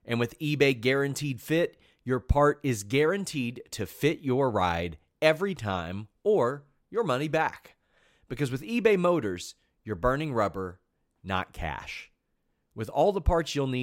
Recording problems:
abrupt cut into speech; at the end

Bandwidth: 16 kHz